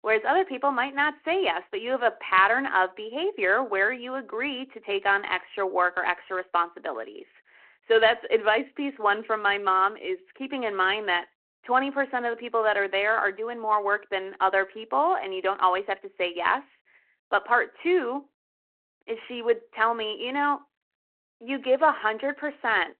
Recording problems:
phone-call audio

